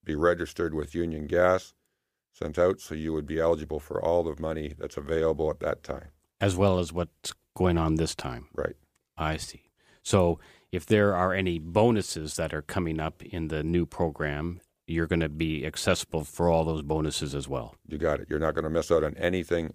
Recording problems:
none

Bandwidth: 15 kHz